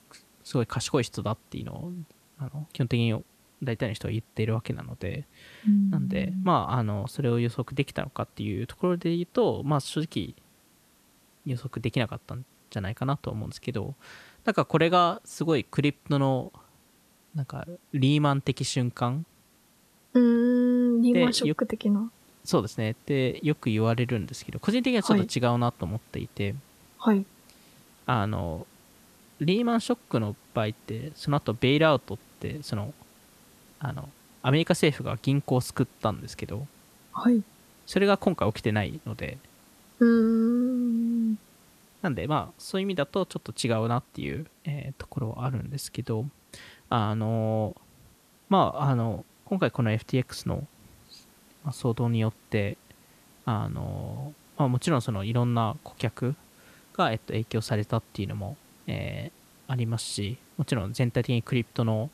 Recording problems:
hiss; faint; throughout; 30 dB below the speech

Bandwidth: 14 kHz